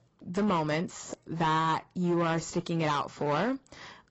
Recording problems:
garbled, watery; badly; nothing above 7.5 kHz
distortion; slight; 9% of the sound clipped

